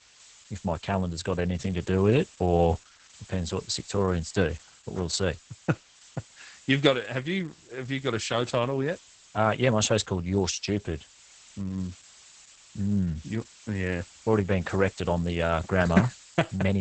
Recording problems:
garbled, watery; badly; nothing above 8 kHz
hiss; faint; throughout; 25 dB below the speech
abrupt cut into speech; at the end

